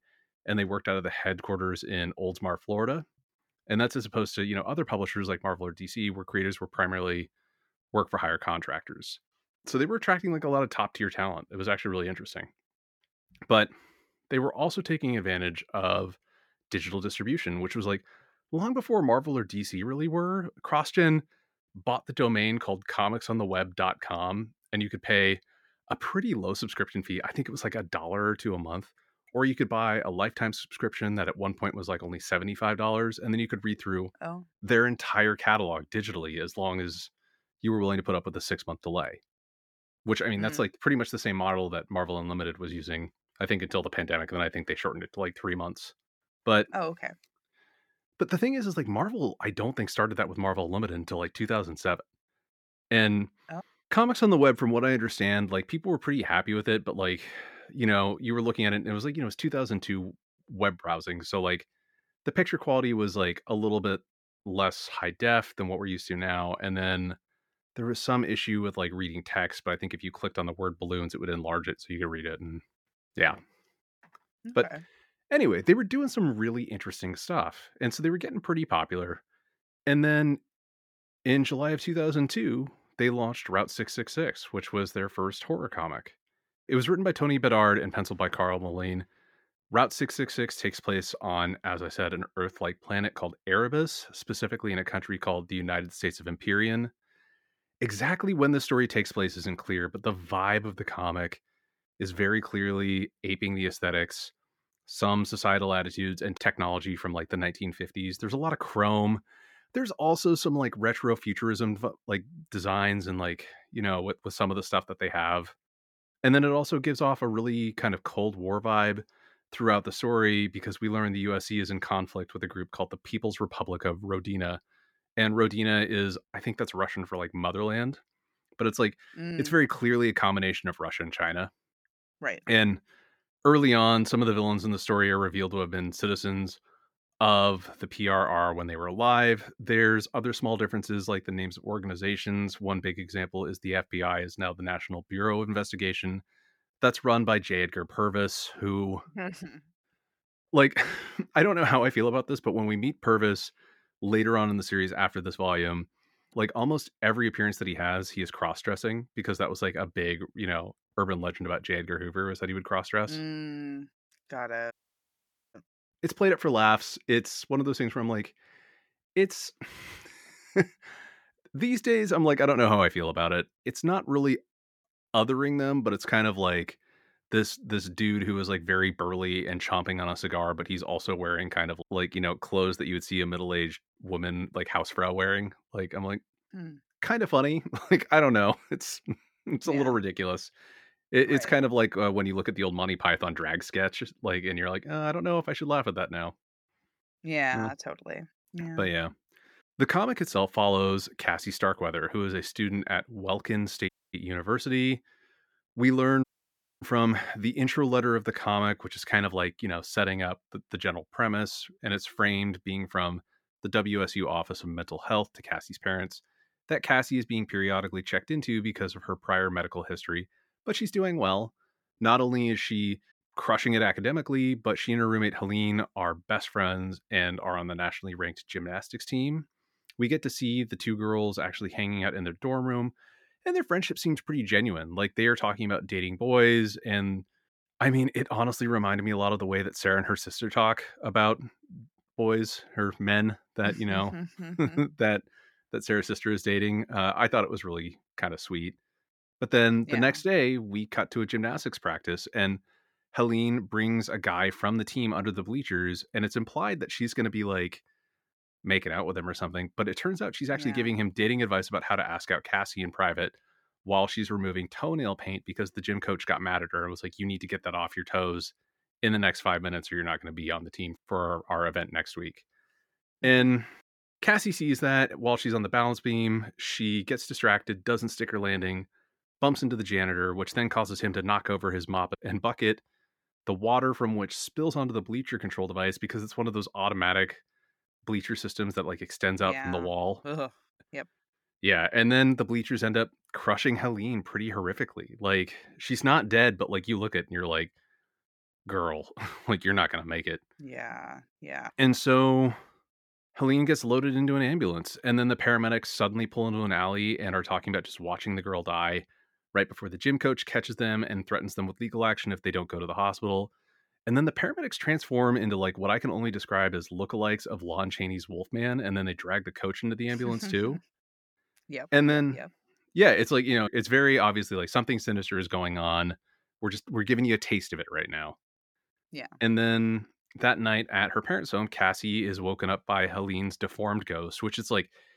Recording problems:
audio cutting out; at 2:45 for 1 s, at 3:24 and at 3:26 for 0.5 s

